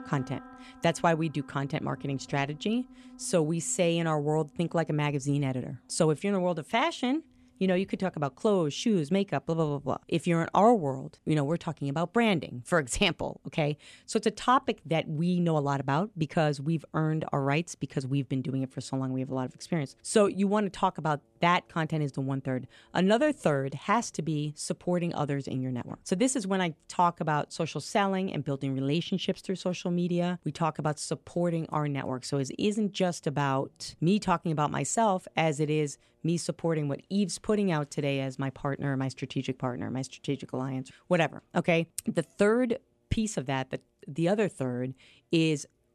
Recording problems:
background music; faint; throughout; 25 dB below the speech

